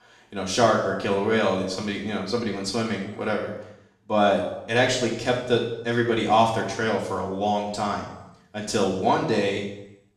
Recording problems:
off-mic speech; far
room echo; noticeable; dies away in 0.8 s

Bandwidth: 14.5 kHz